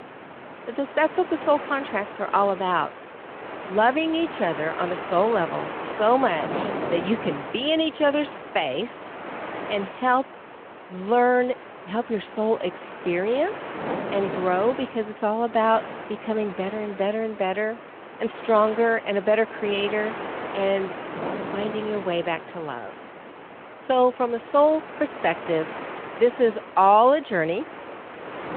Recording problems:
phone-call audio
wind noise on the microphone; occasional gusts; 10 dB below the speech

